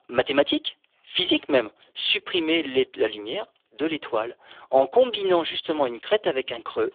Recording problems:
phone-call audio; poor line
thin; very; fading below 350 Hz

